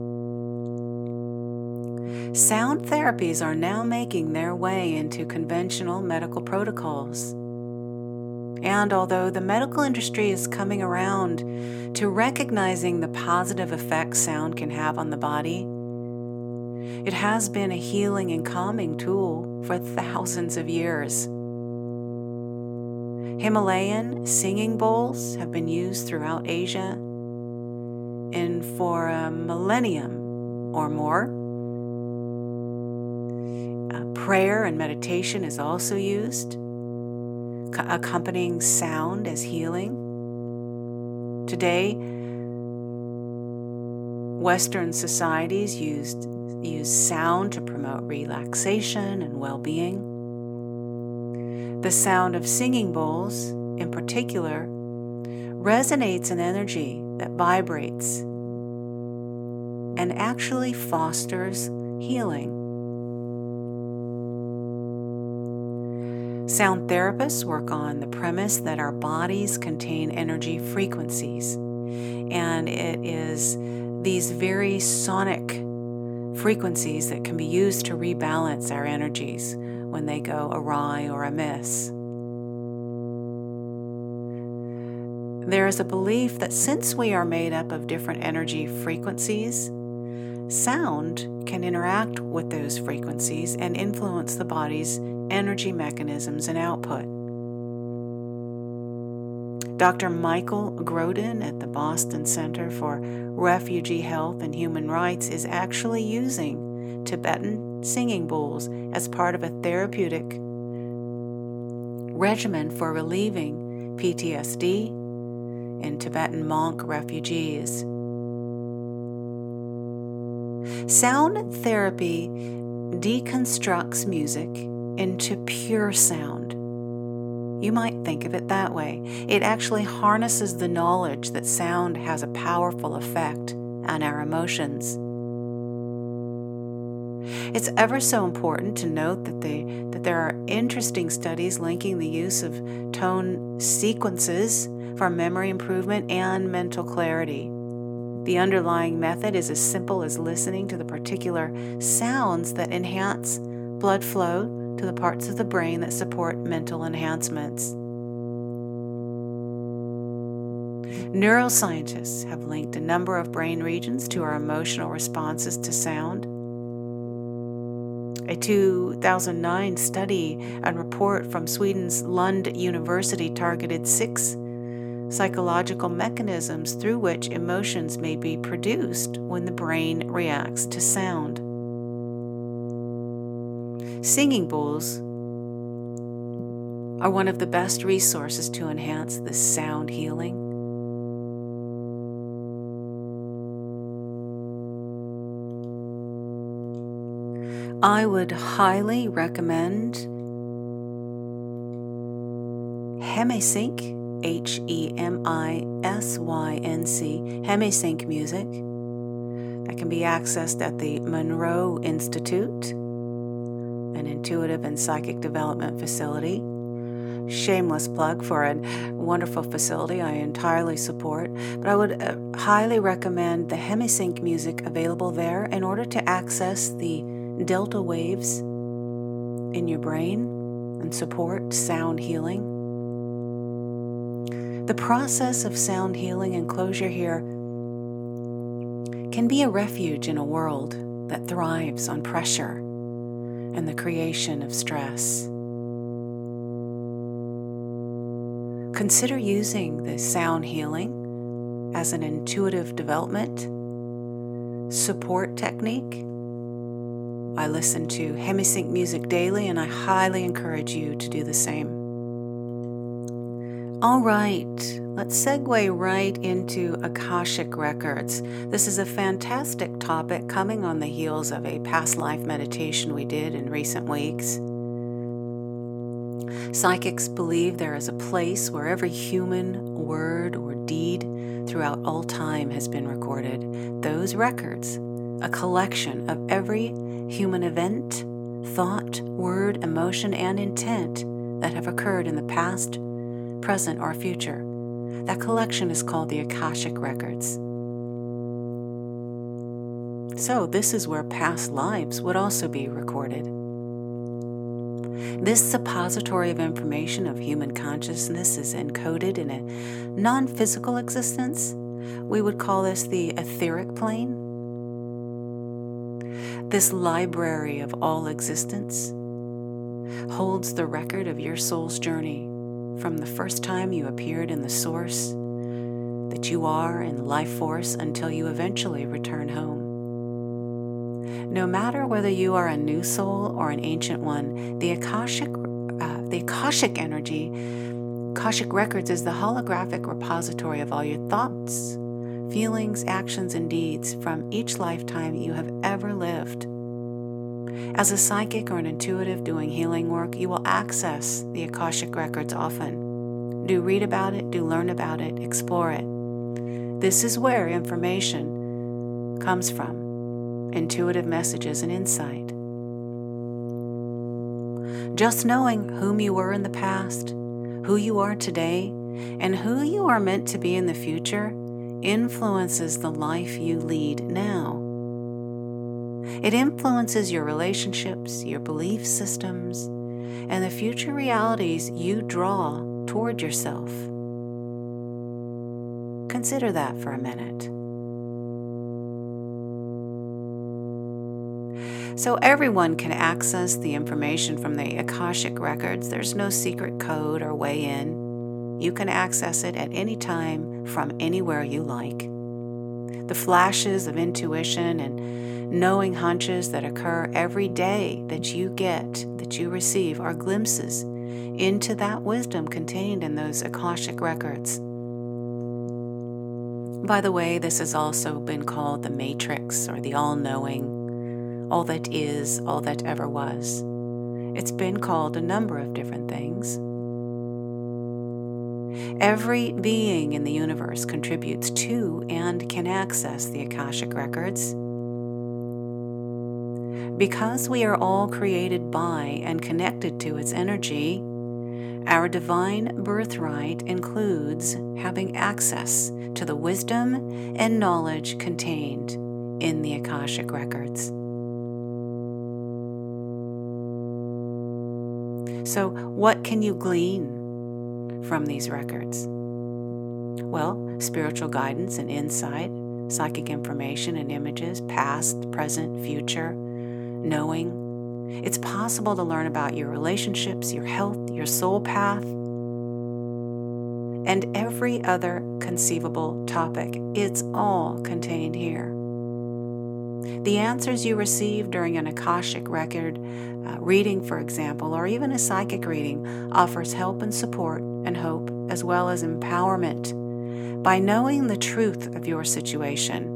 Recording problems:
electrical hum; loud; throughout; 60 Hz, 10 dB below the speech

